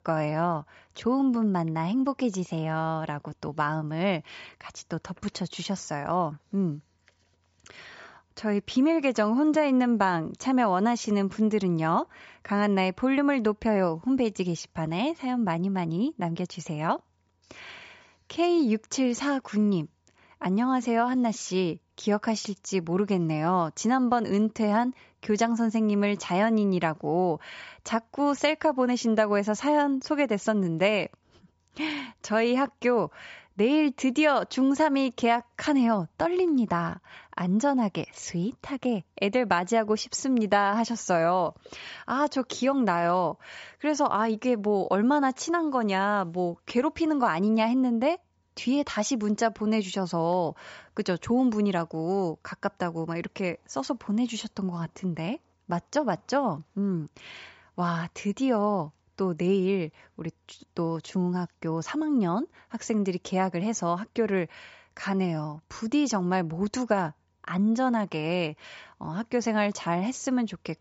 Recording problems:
high frequencies cut off; noticeable; nothing above 8 kHz

